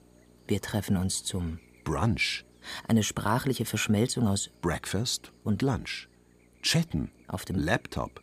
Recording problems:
electrical hum; faint; throughout; 60 Hz, 30 dB below the speech

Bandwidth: 15 kHz